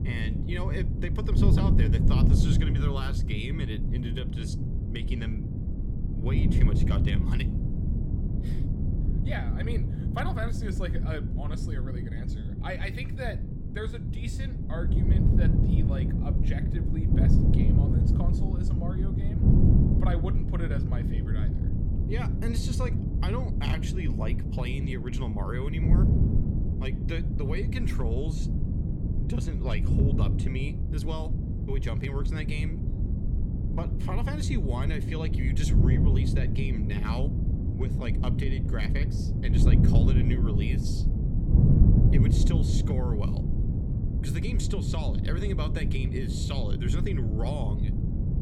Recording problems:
wind noise on the microphone; heavy; as loud as the speech

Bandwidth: 17.5 kHz